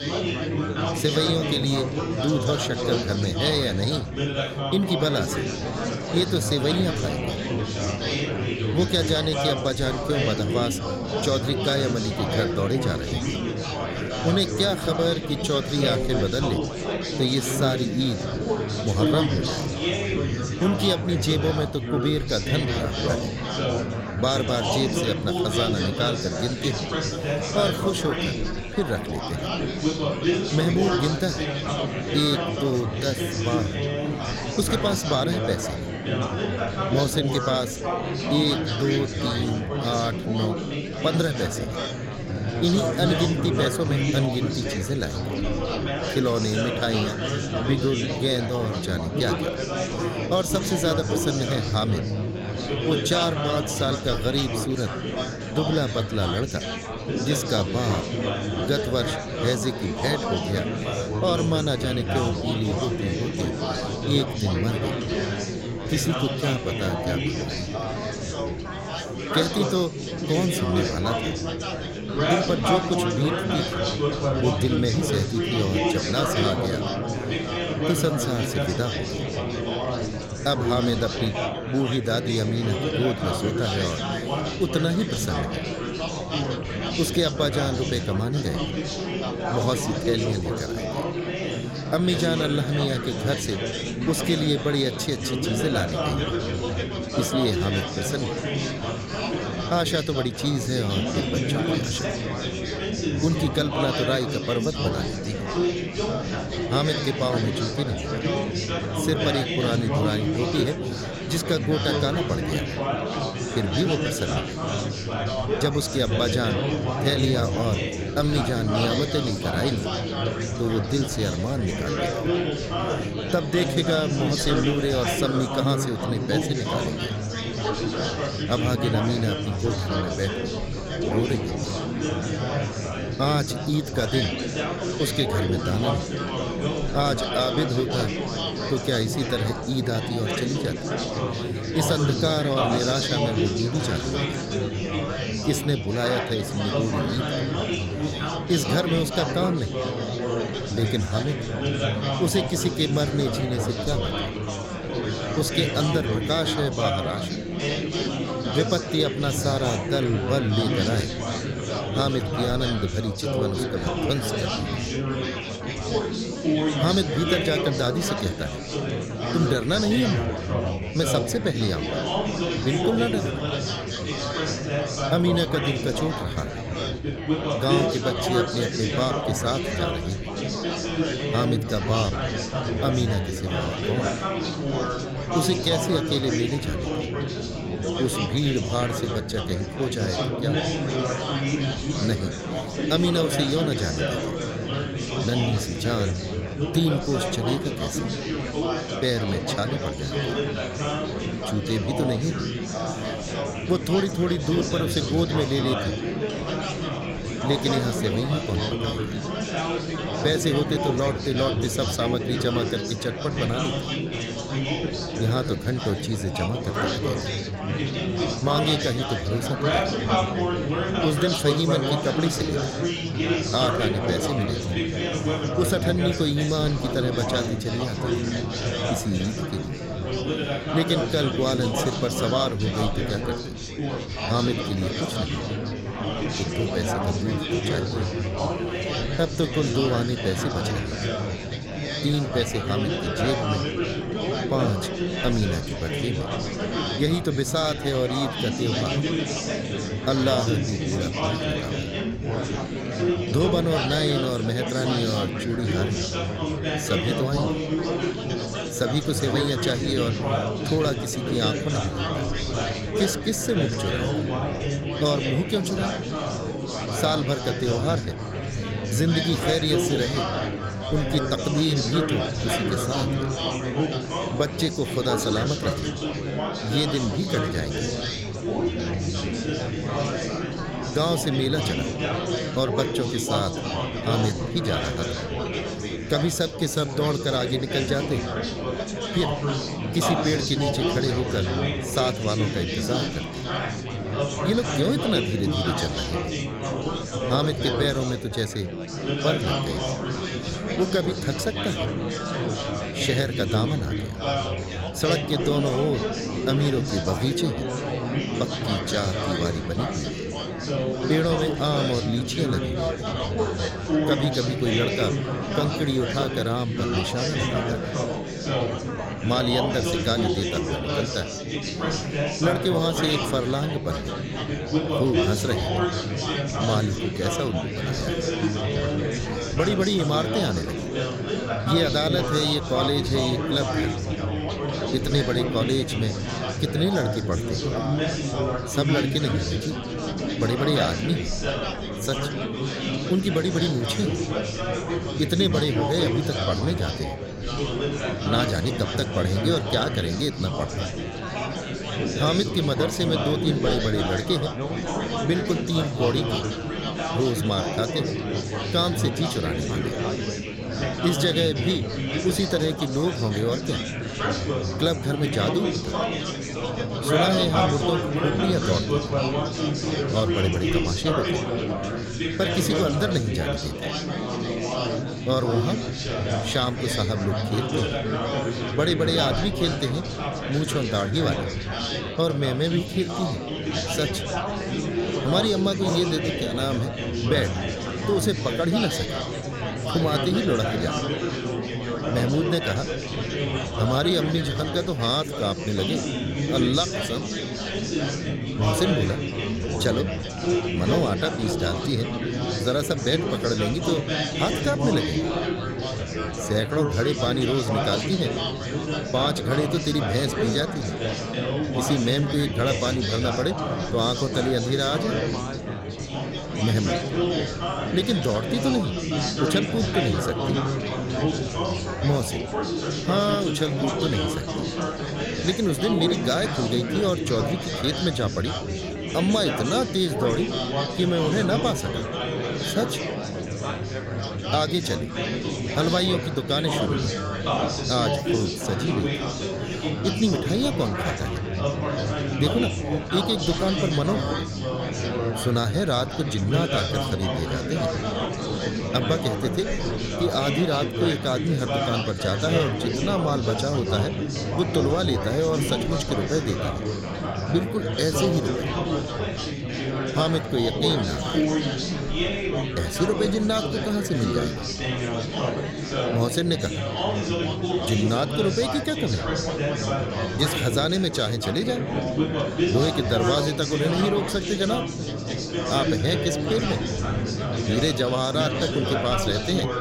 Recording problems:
chatter from many people; loud; throughout; 1 dB below the speech

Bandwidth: 16 kHz